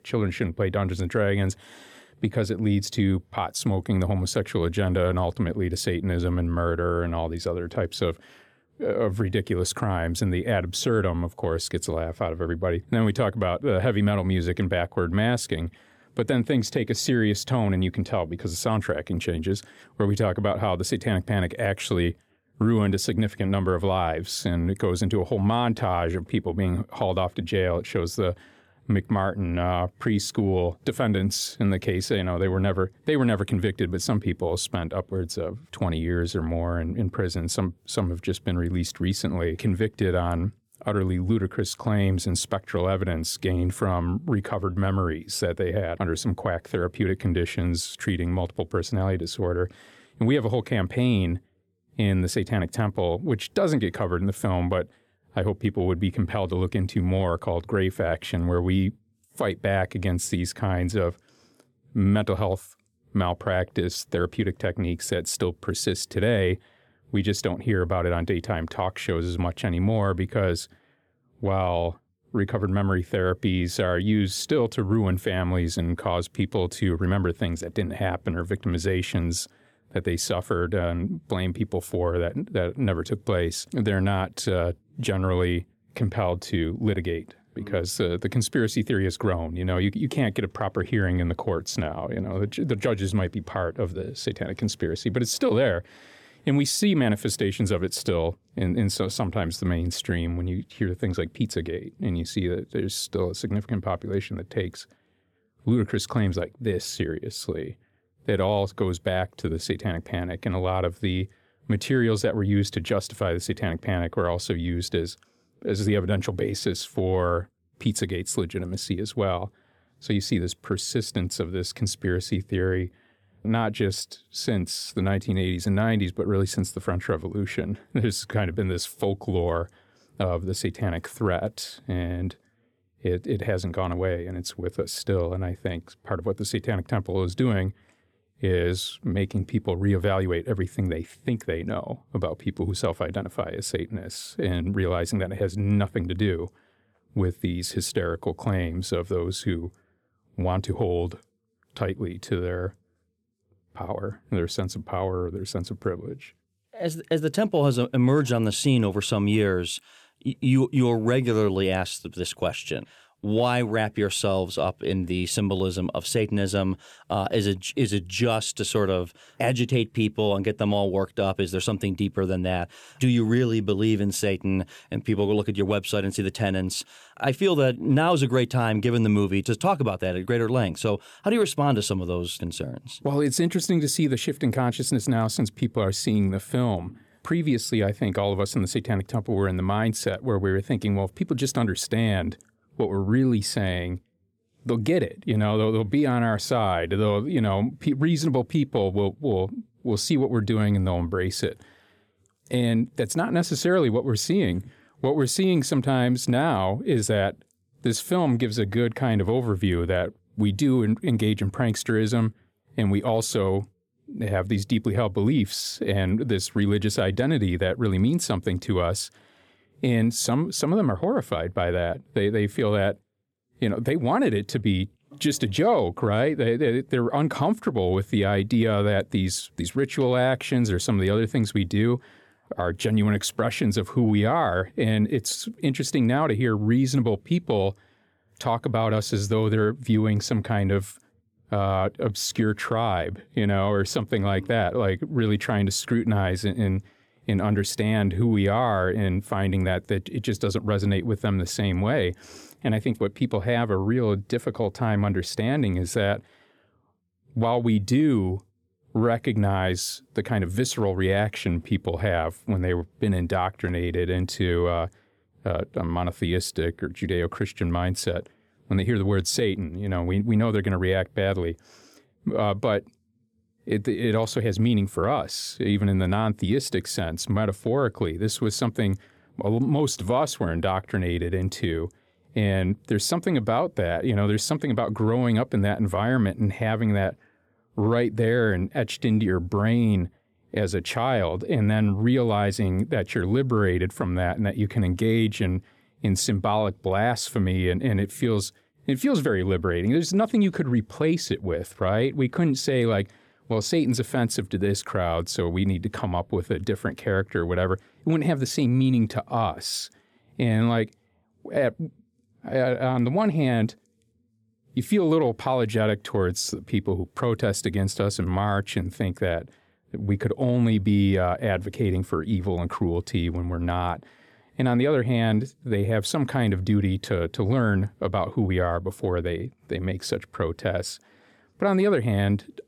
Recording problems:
none

